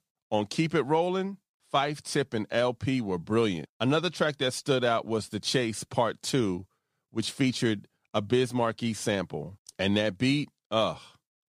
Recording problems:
none

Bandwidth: 15 kHz